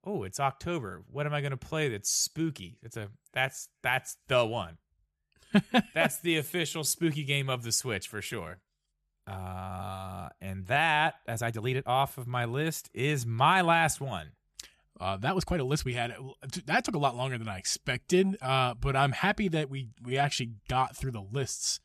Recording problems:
uneven, jittery; strongly; from 1.5 to 21 s

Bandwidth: 13.5 kHz